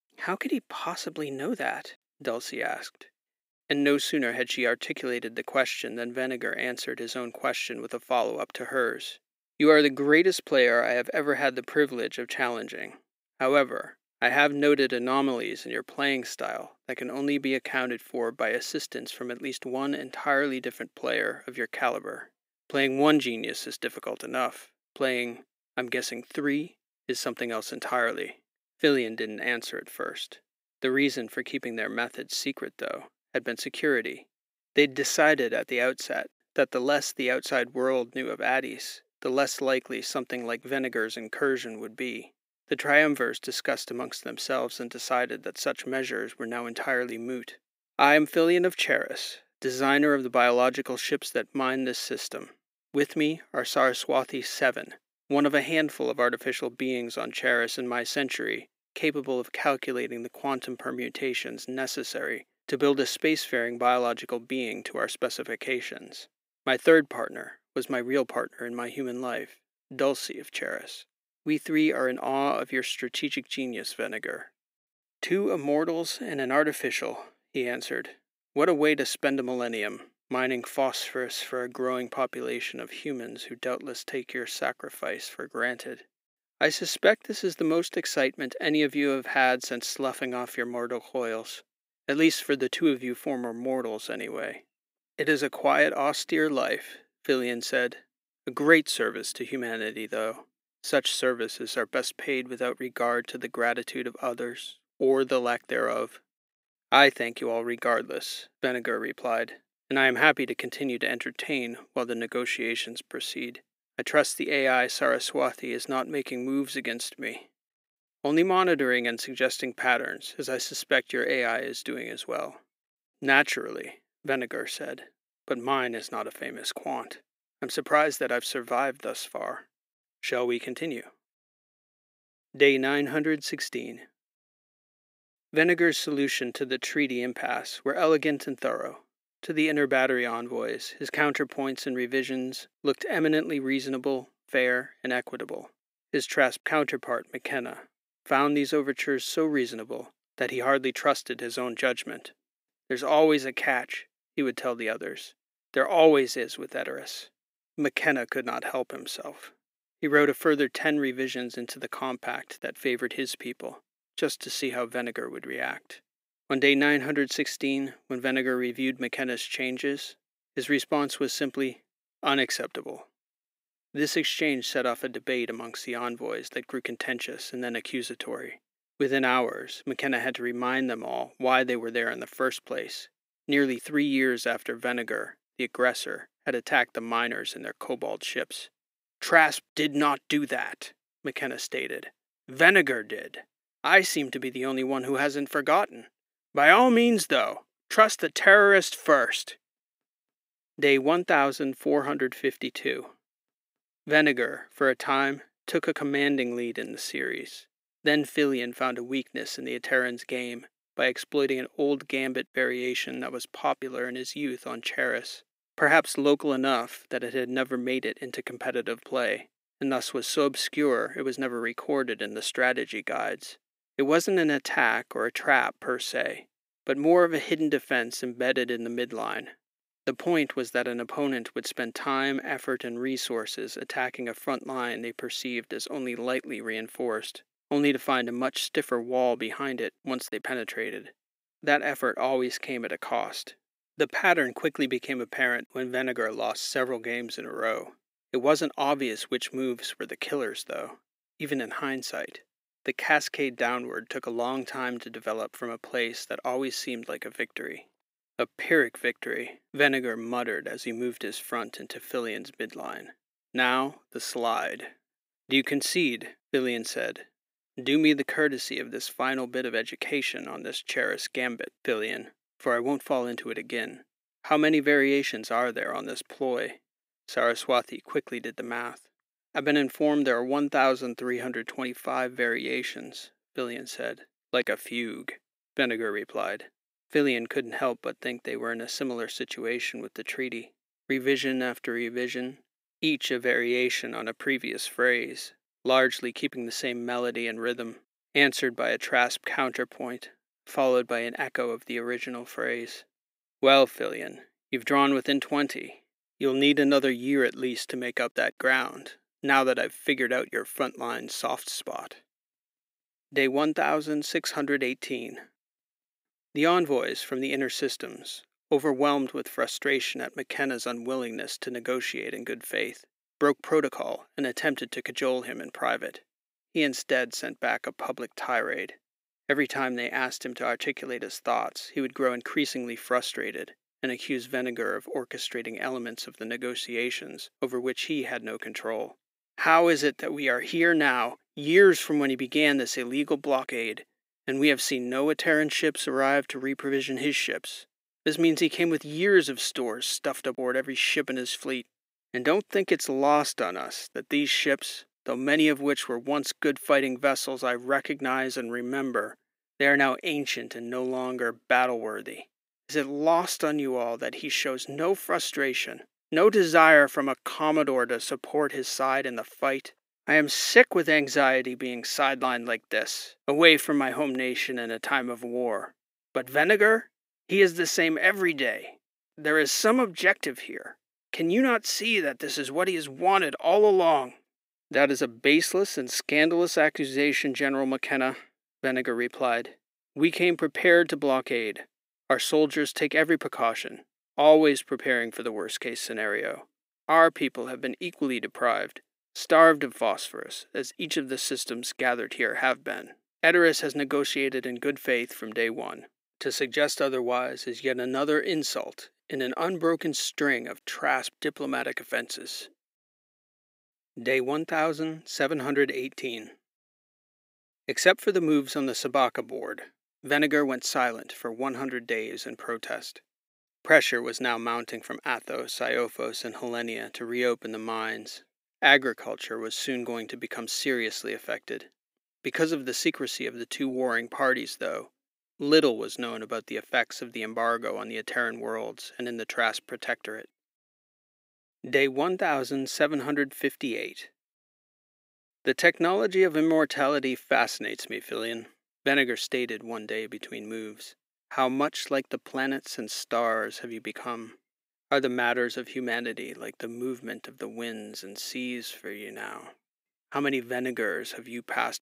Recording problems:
thin; somewhat; fading below 300 Hz

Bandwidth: 15.5 kHz